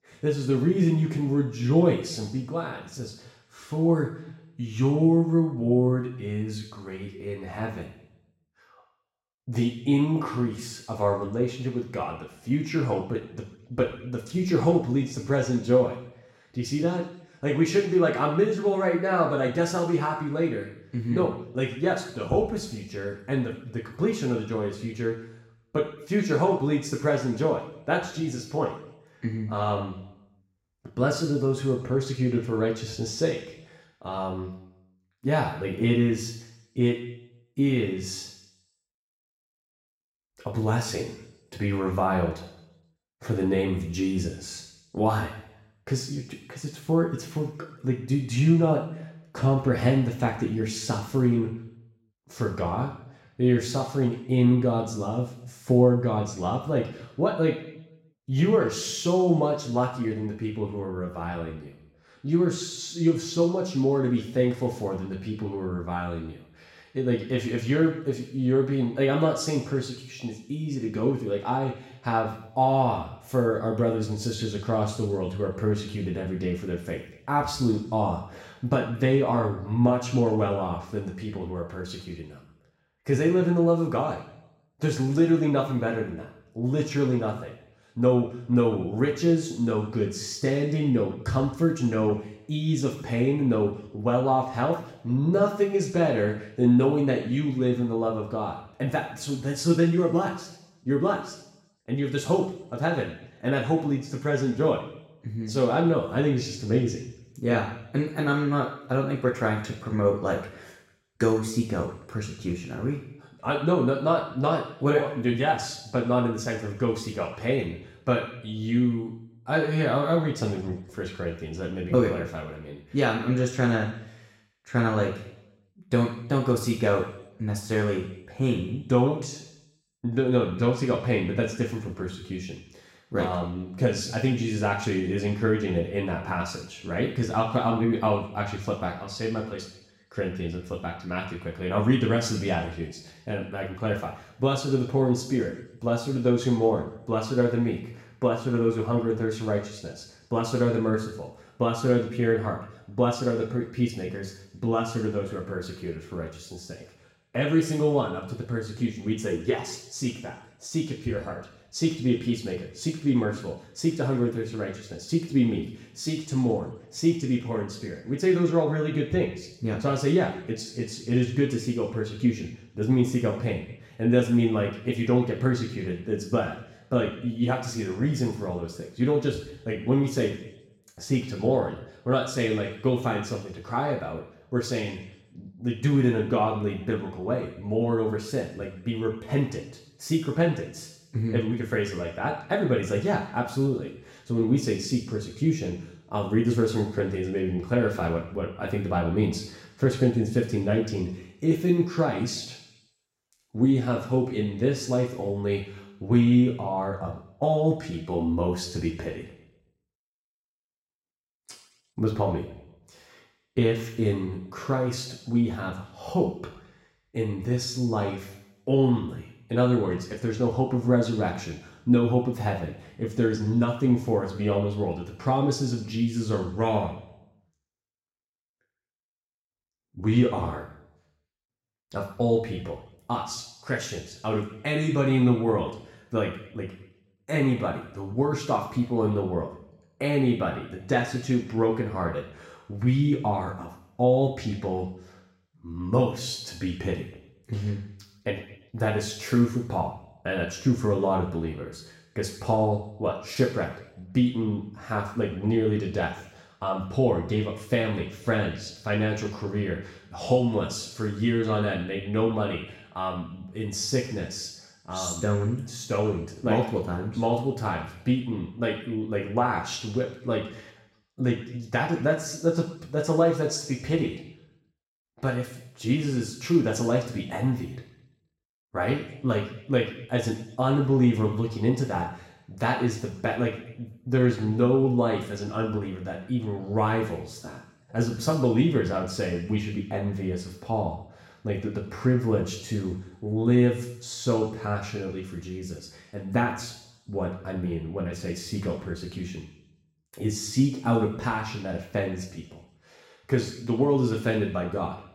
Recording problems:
off-mic speech; far
room echo; noticeable; dies away in 0.8 s

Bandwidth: 16 kHz